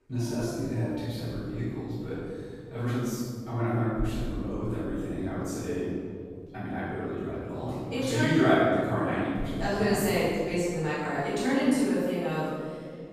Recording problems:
room echo; strong; dies away in 2.2 s
off-mic speech; far
dog barking; faint; until 6.5 s; peak 10 dB below the speech

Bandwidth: 14.5 kHz